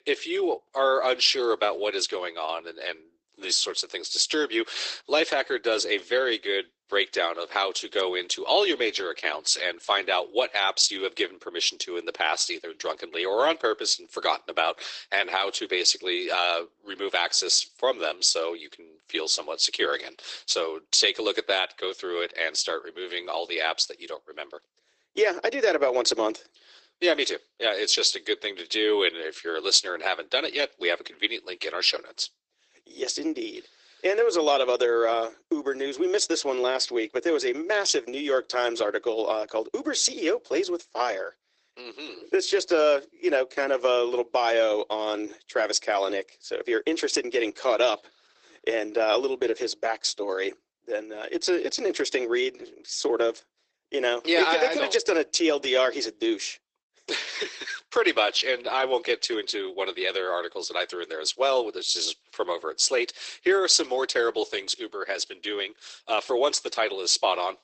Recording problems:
garbled, watery; badly; nothing above 8 kHz
thin; very; fading below 350 Hz

